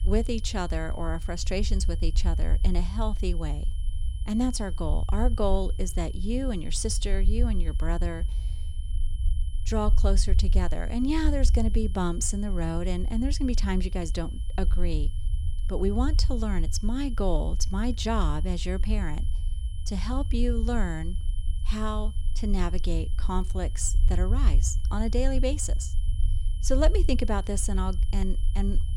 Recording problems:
low rumble; noticeable; throughout; 15 dB below the speech
high-pitched whine; faint; throughout; 3 kHz, 20 dB below the speech

